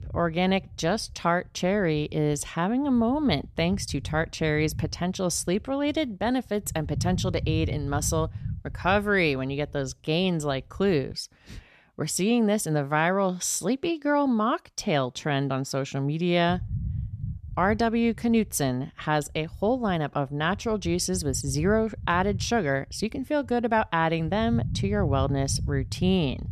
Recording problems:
low rumble; faint; until 11 s and from 17 s on; 20 dB below the speech

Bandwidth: 14 kHz